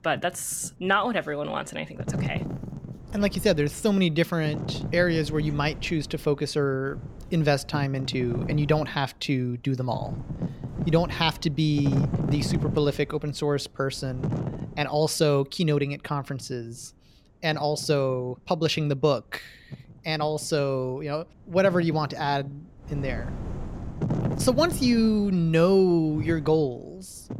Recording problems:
wind noise on the microphone; occasional gusts; 15 dB below the speech

